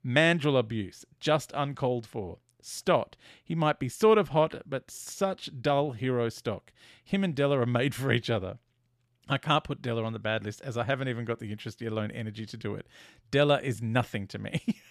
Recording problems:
none

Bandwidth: 14.5 kHz